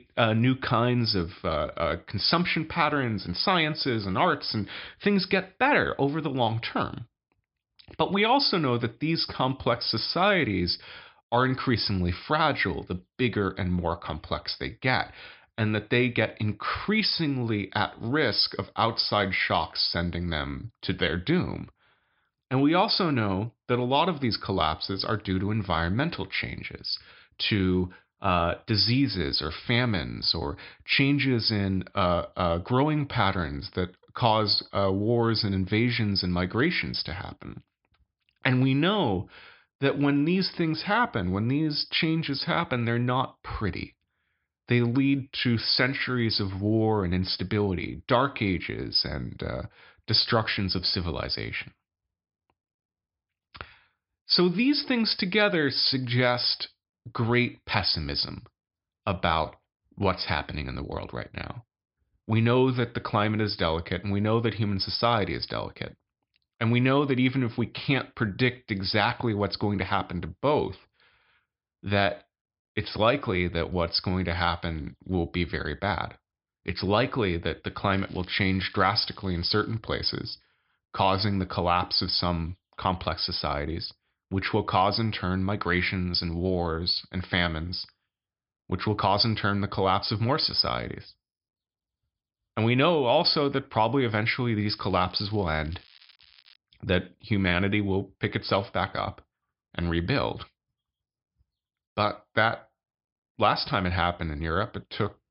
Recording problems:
high frequencies cut off; noticeable; nothing above 5.5 kHz
crackling; faint; from 1:18 to 1:20 and from 1:35 to 1:37; 25 dB below the speech

